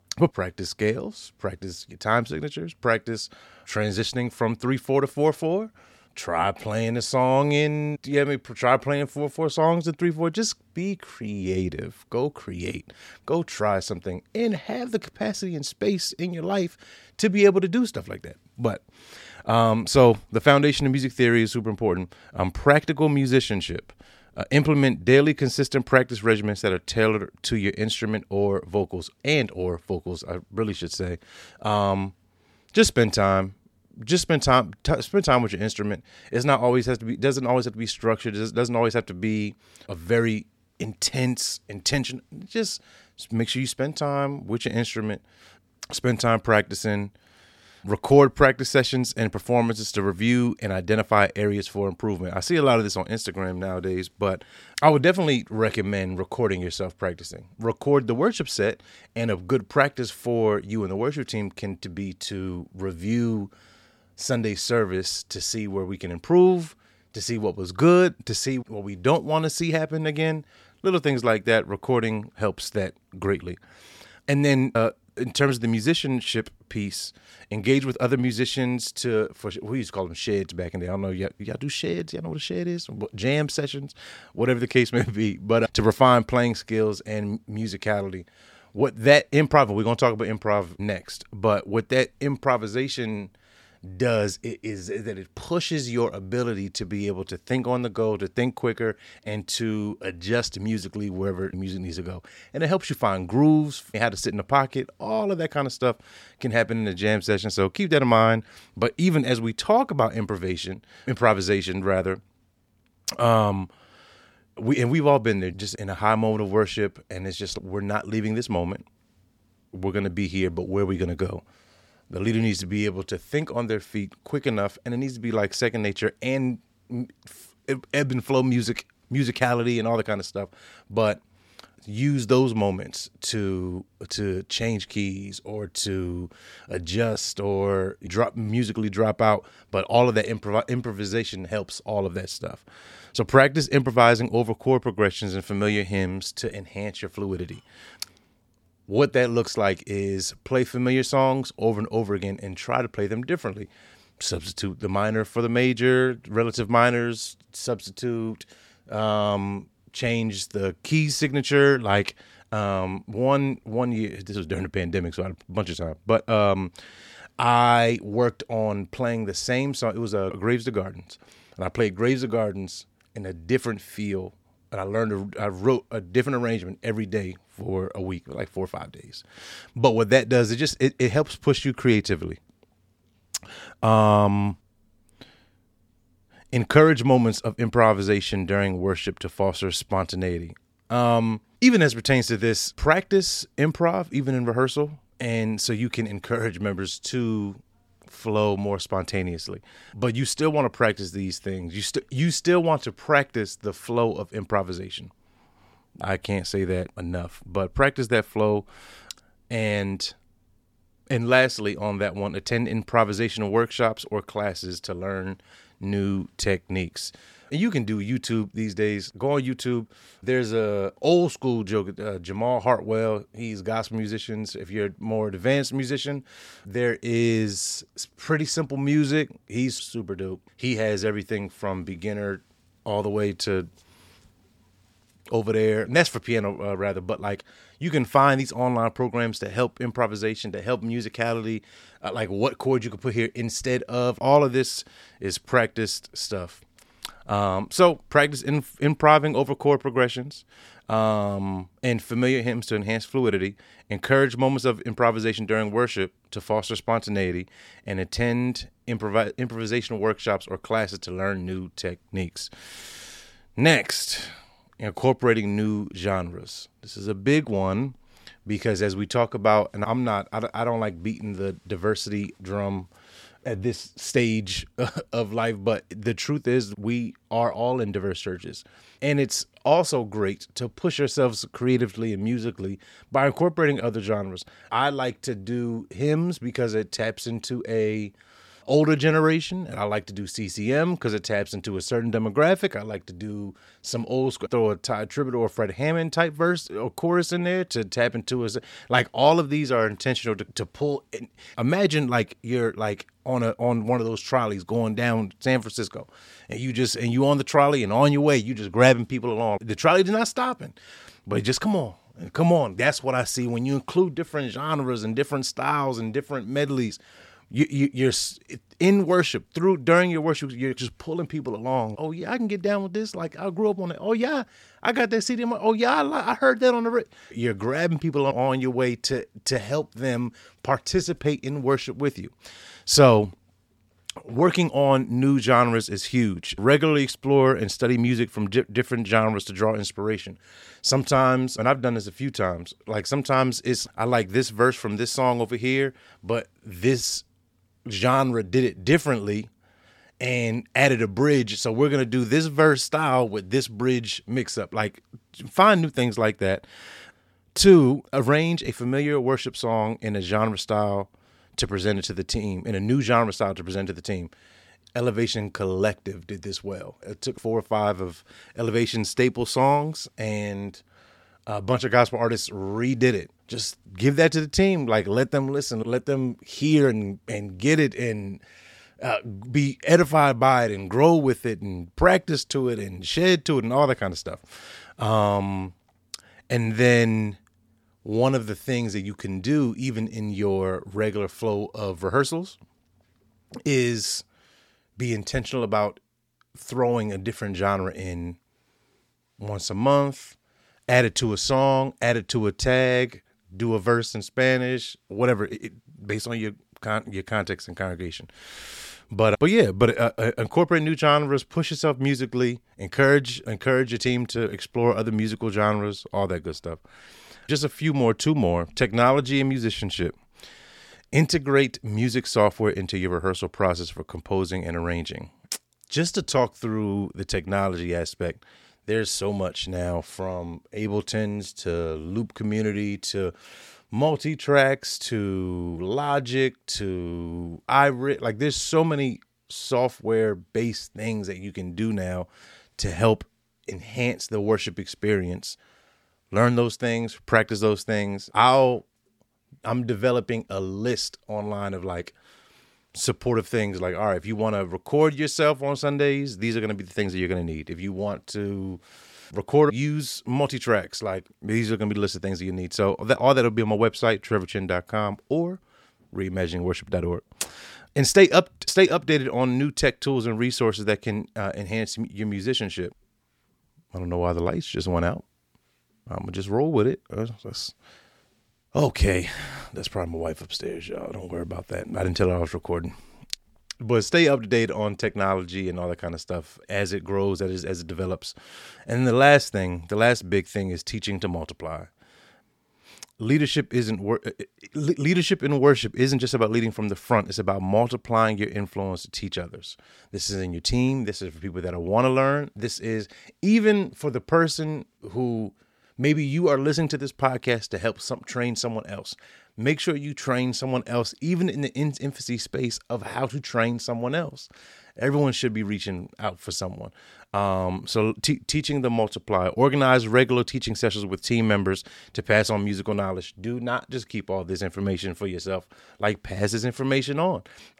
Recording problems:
none

